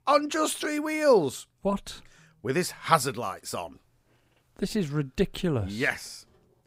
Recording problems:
none

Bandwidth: 15.5 kHz